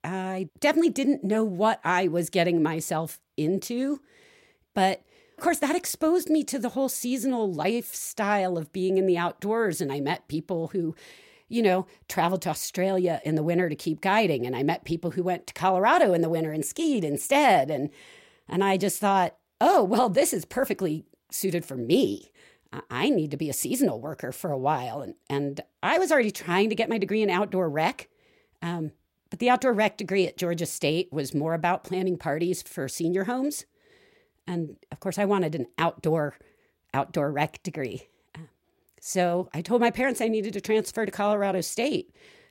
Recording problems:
none

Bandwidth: 16 kHz